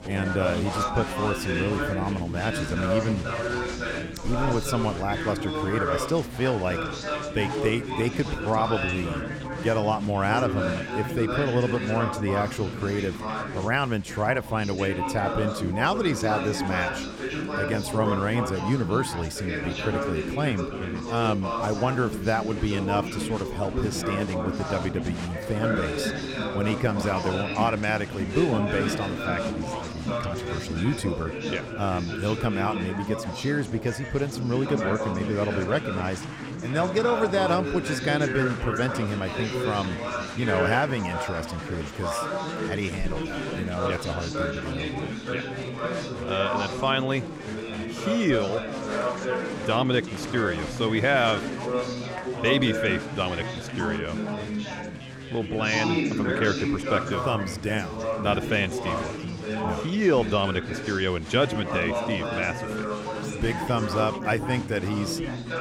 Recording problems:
chatter from many people; loud; throughout; 3 dB below the speech

